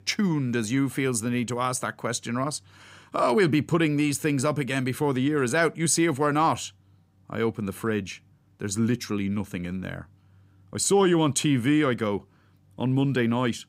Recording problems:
none

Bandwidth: 15.5 kHz